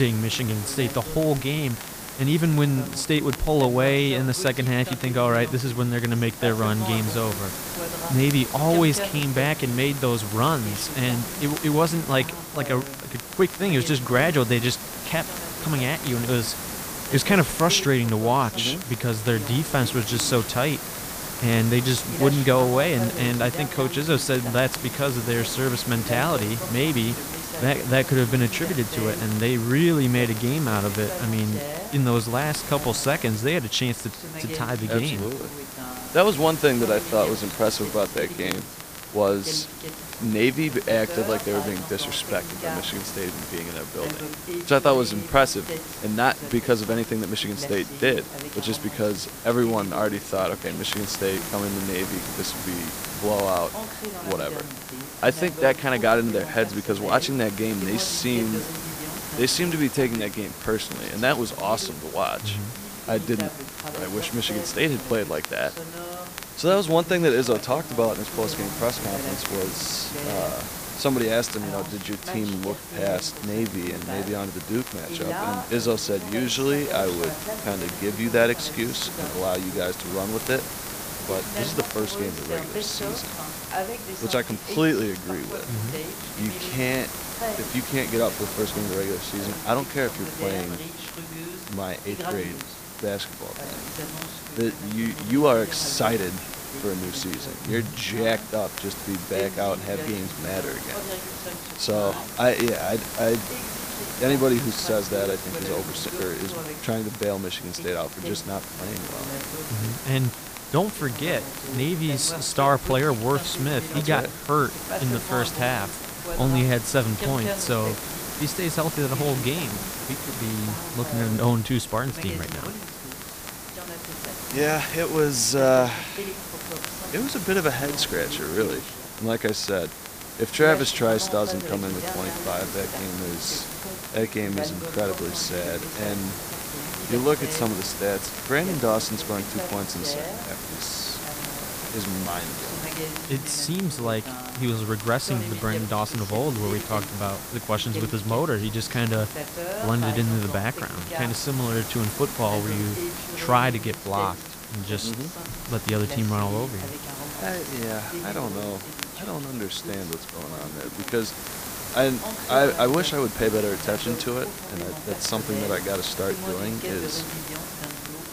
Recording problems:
hiss; loud; throughout; 8 dB below the speech
voice in the background; noticeable; throughout; 10 dB below the speech
crackle, like an old record; noticeable; 20 dB below the speech
abrupt cut into speech; at the start

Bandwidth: 15 kHz